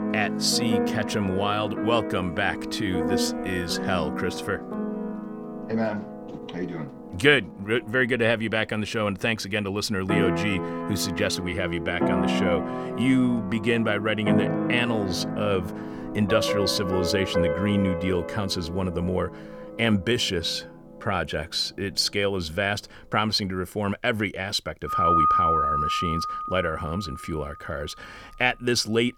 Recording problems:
background music; loud; throughout; 2 dB below the speech

